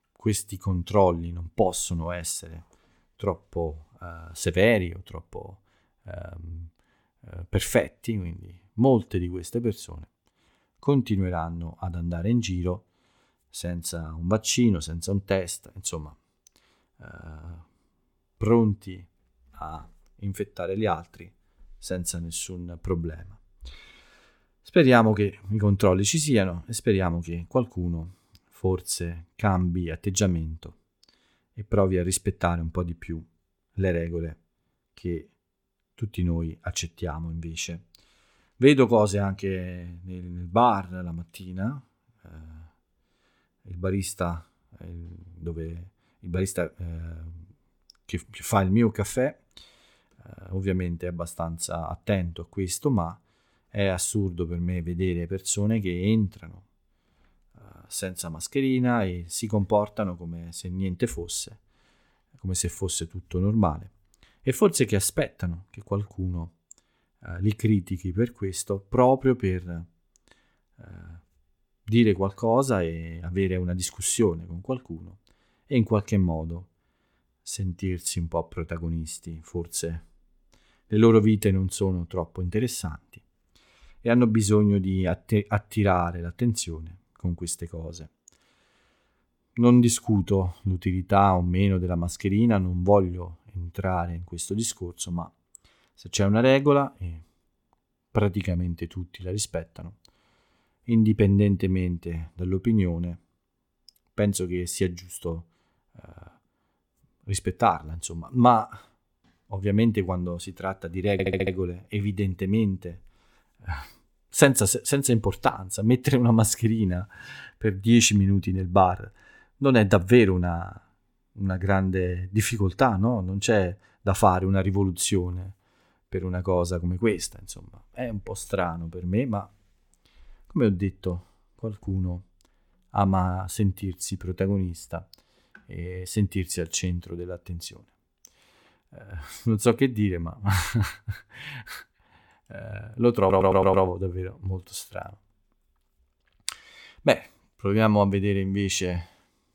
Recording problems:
audio stuttering; at 1:51 and at 2:23

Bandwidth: 18 kHz